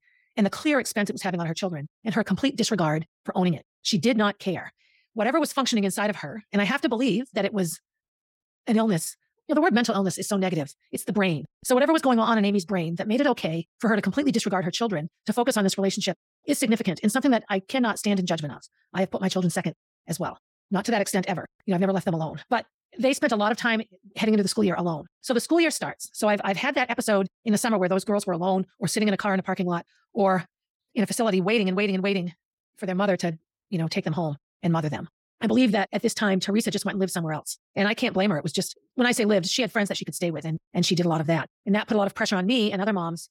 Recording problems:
wrong speed, natural pitch; too fast; 1.5 times normal speed

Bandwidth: 17 kHz